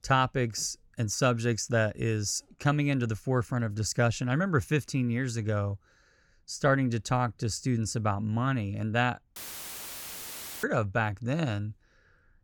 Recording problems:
audio cutting out; filled with static; at 9.5 s for 1.5 s

